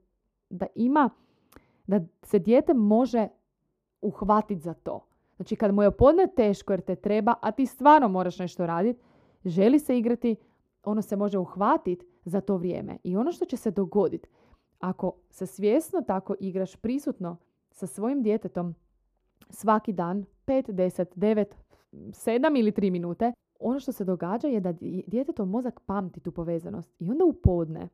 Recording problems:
muffled; slightly; fading above 1.5 kHz

